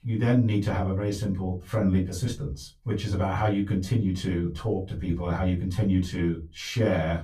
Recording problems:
off-mic speech; far
room echo; very slight; dies away in 0.2 s

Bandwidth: 15 kHz